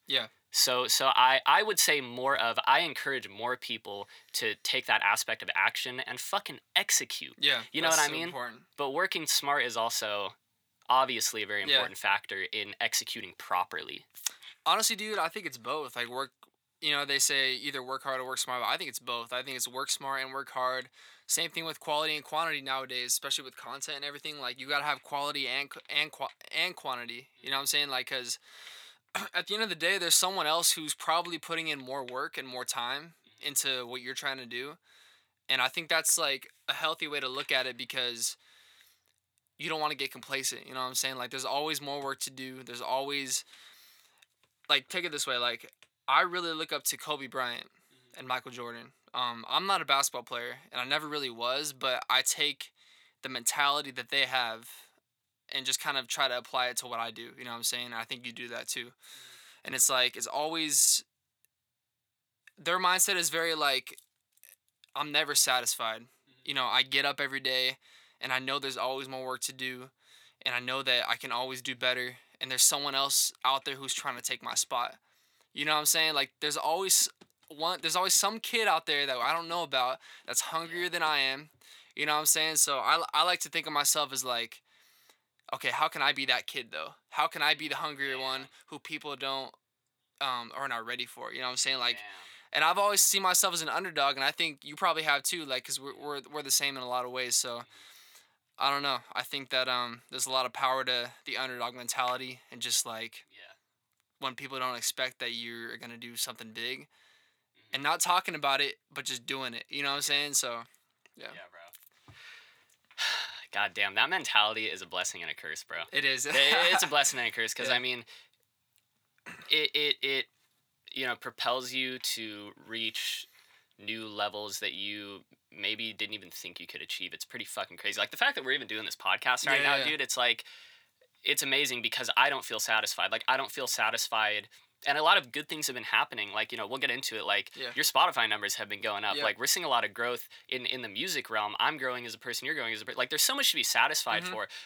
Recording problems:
thin; somewhat; fading below 1 kHz

